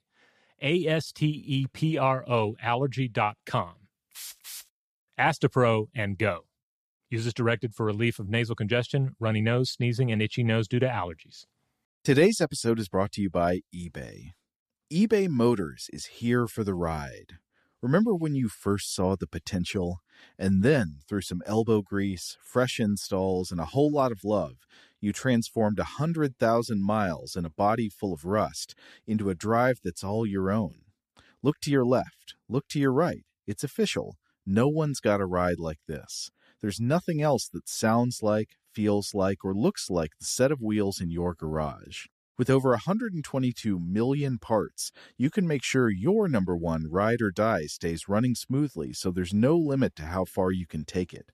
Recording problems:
none

